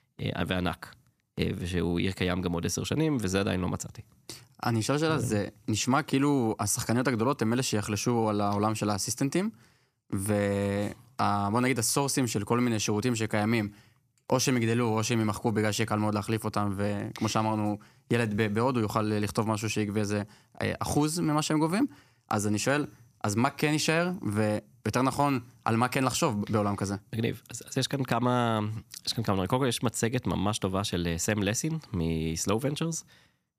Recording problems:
none

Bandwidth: 14.5 kHz